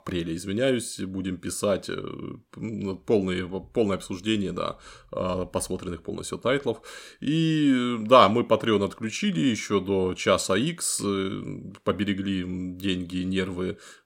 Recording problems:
none

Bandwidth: 16.5 kHz